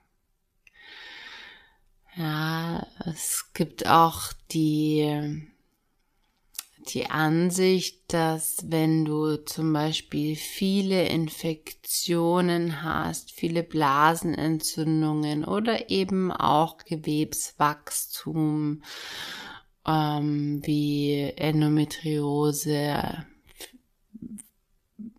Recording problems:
wrong speed, natural pitch; too slow; 0.6 times normal speed

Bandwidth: 14.5 kHz